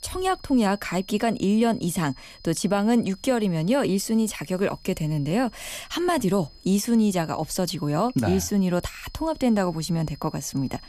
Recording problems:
high-pitched whine; faint; throughout; 5 kHz, 25 dB below the speech

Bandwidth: 14.5 kHz